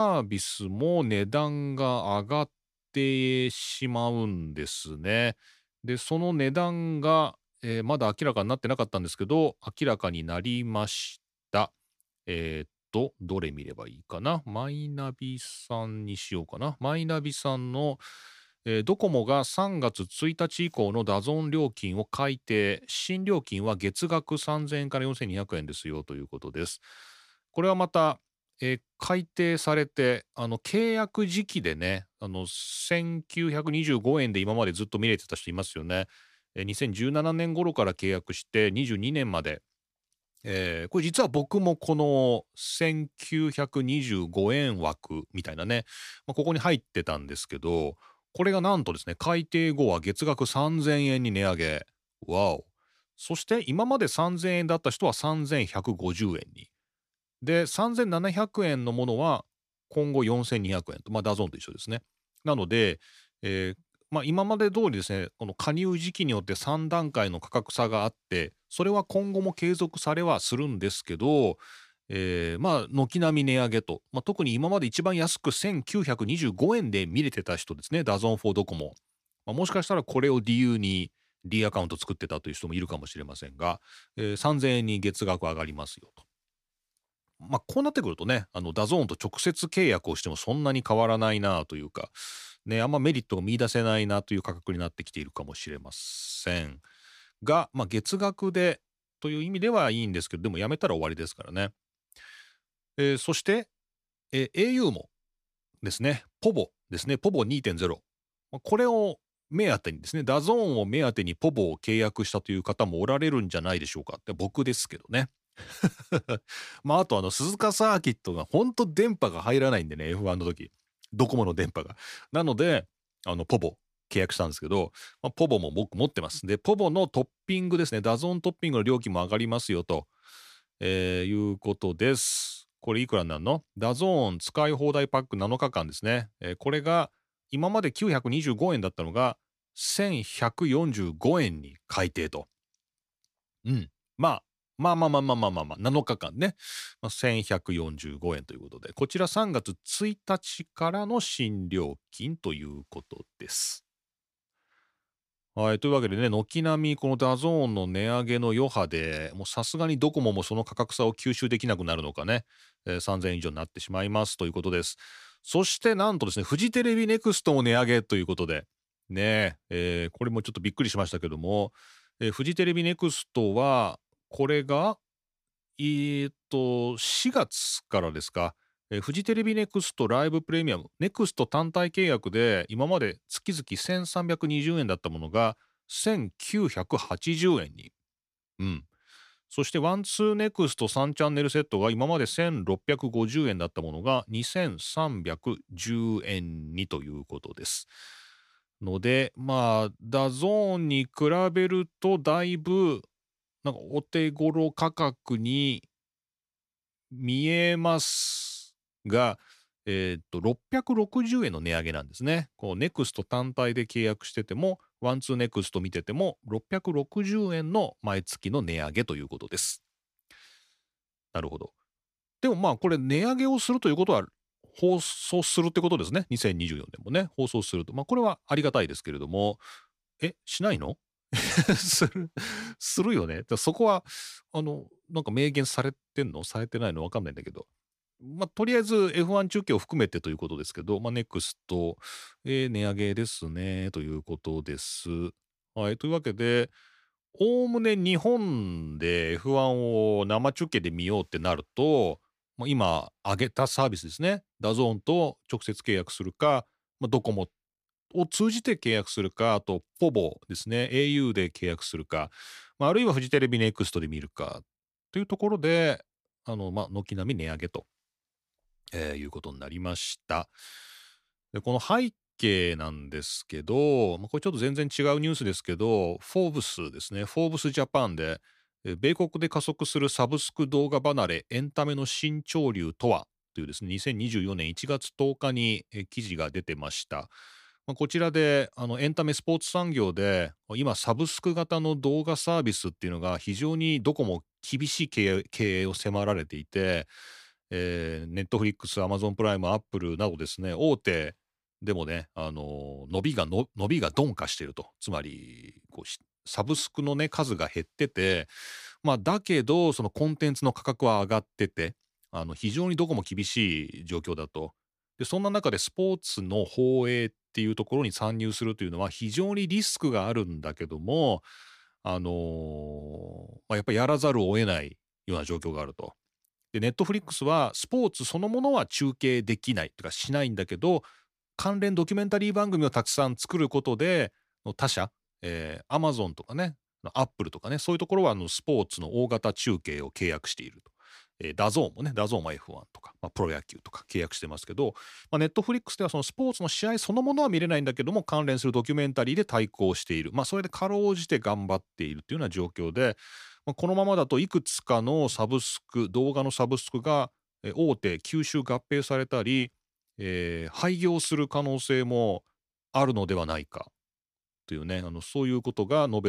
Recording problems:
abrupt cut into speech; at the start and the end

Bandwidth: 14.5 kHz